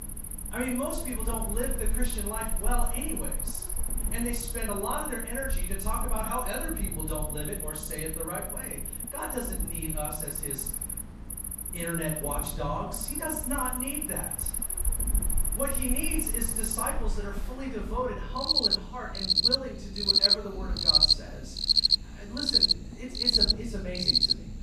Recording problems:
off-mic speech; far
room echo; noticeable; dies away in 0.5 s
animal sounds; very loud; throughout; 8 dB above the speech
low rumble; noticeable; throughout; 15 dB below the speech

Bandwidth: 14.5 kHz